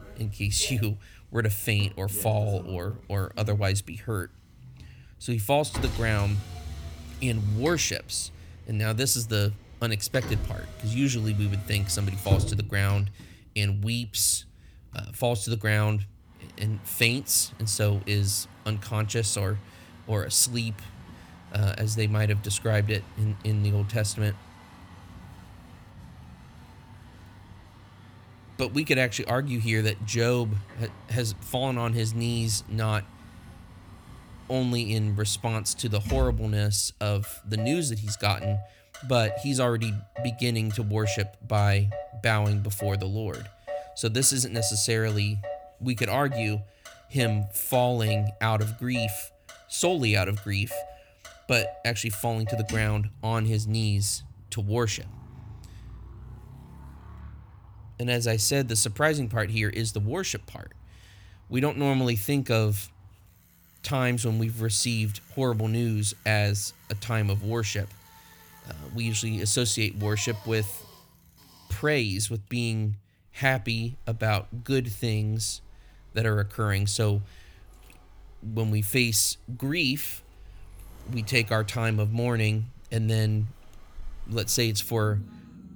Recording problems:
traffic noise; noticeable; throughout; 15 dB below the speech

